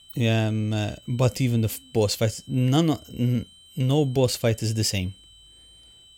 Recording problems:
high-pitched whine; faint; throughout; 3 kHz, 25 dB below the speech

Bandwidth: 16.5 kHz